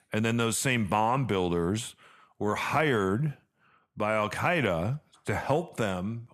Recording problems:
none

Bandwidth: 13.5 kHz